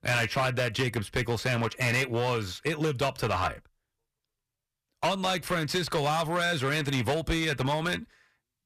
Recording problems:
distortion; heavy; 11% of the sound clipped

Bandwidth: 14.5 kHz